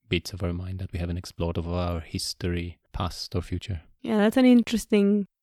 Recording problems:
uneven, jittery; strongly; from 1 to 5 s

